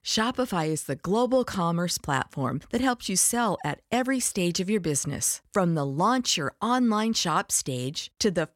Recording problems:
none

